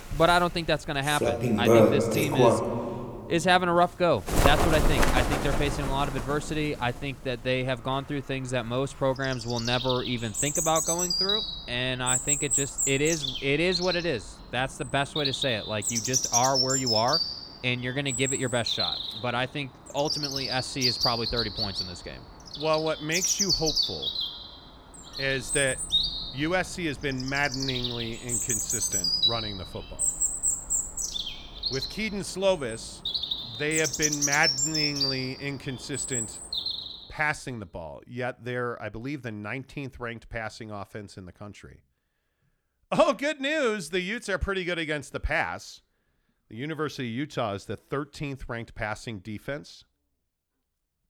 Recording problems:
animal sounds; very loud; until 37 s; 2 dB above the speech

